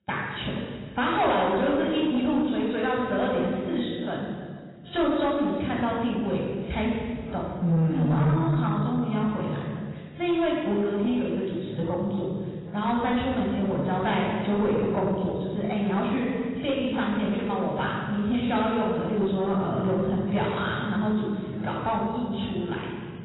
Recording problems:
room echo; strong; dies away in 1.8 s
off-mic speech; far
garbled, watery; badly; nothing above 4 kHz
distortion; slight; 10 dB below the speech

